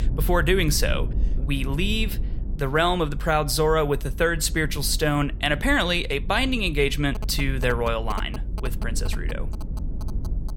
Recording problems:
low rumble; faint; throughout; 20 dB below the speech
phone ringing; faint; from 7 s on; peak 15 dB below the speech

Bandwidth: 17.5 kHz